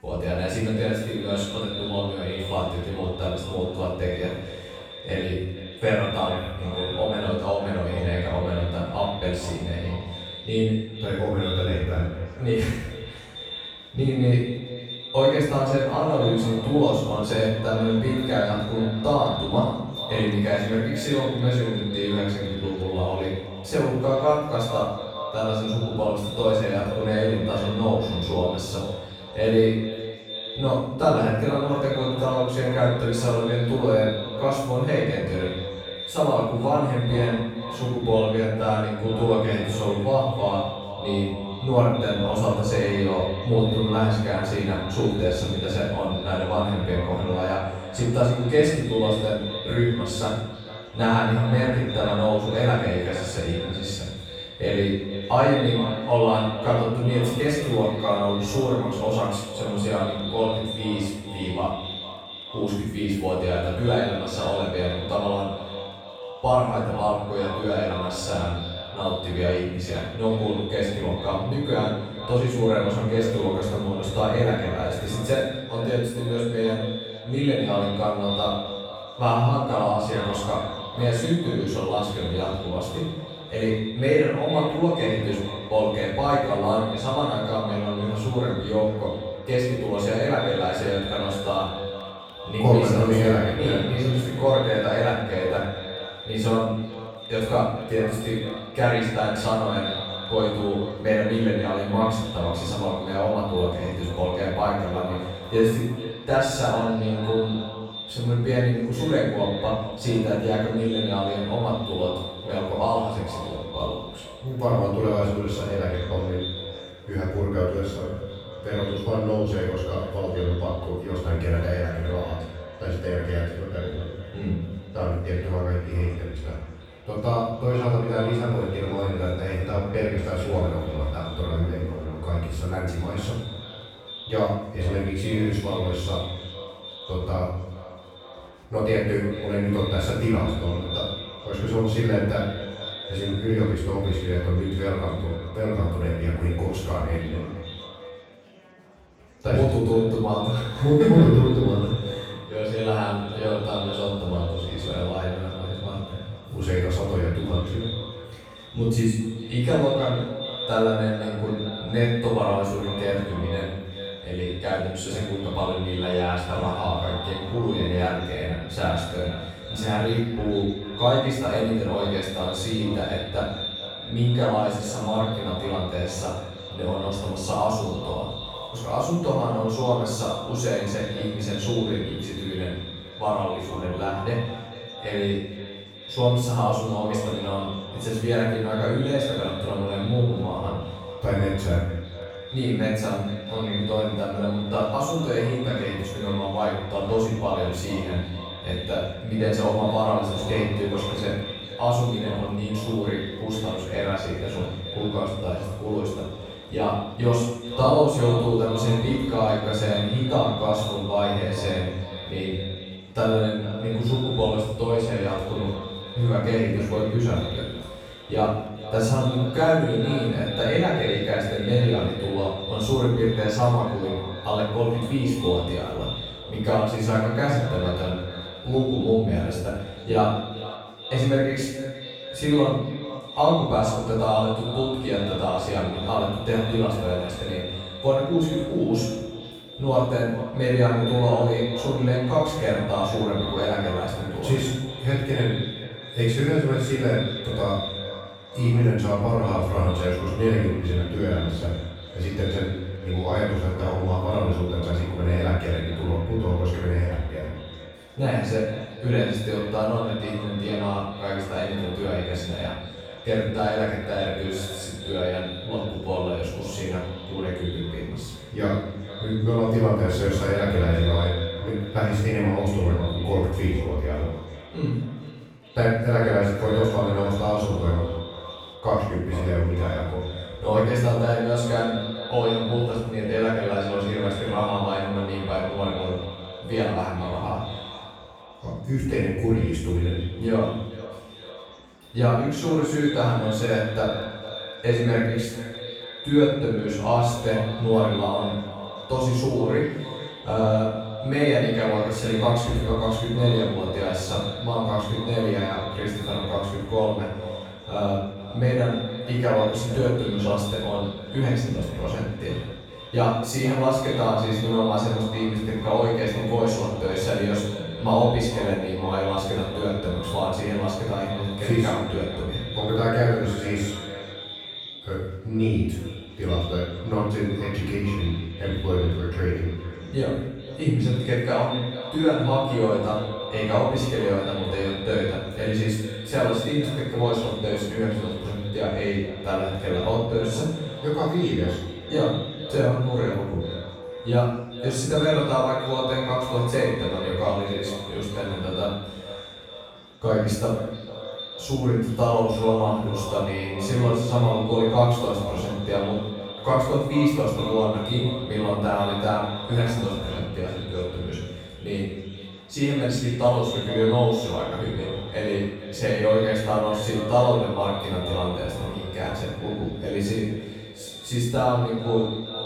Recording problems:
echo of what is said; strong; throughout; 440 ms later, 10 dB below the speech
room echo; strong; dies away in 0.8 s
off-mic speech; far
murmuring crowd; faint; throughout; 30 dB below the speech

